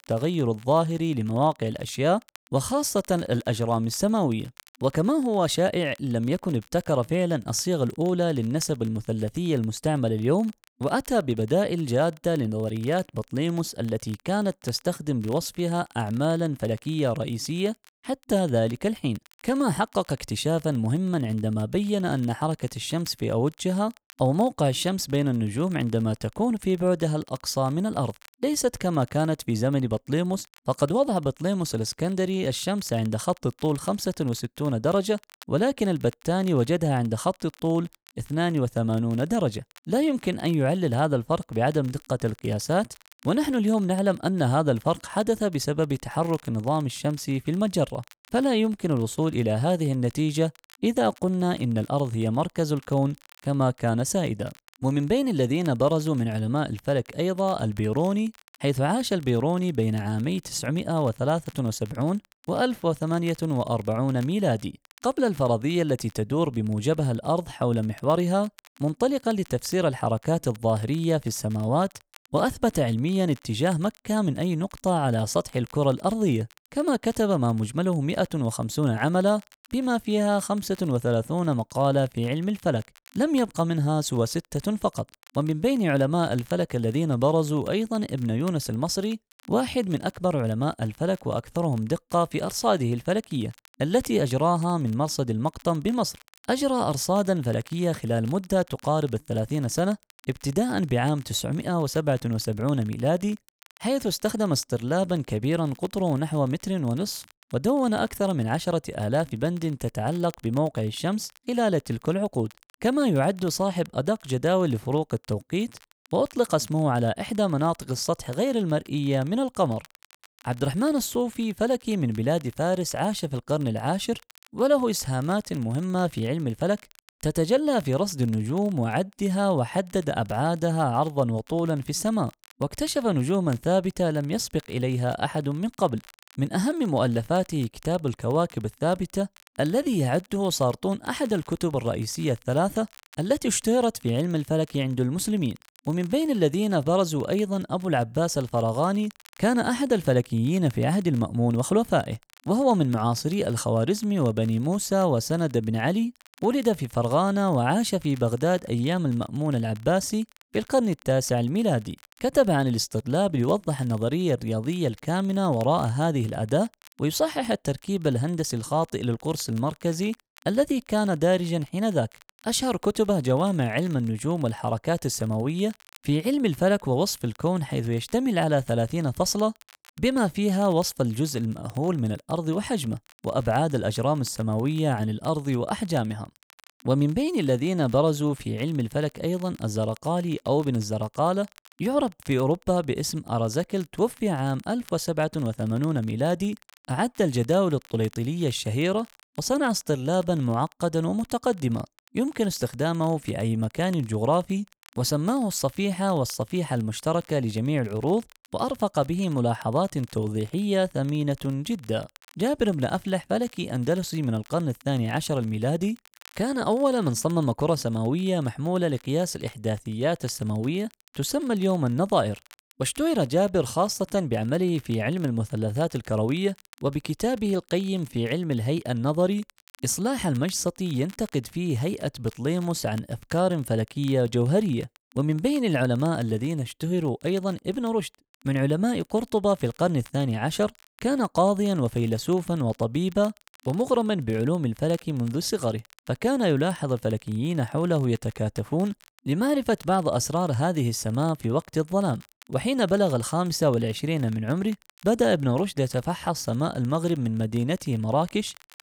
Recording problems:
crackle, like an old record; faint; 30 dB below the speech

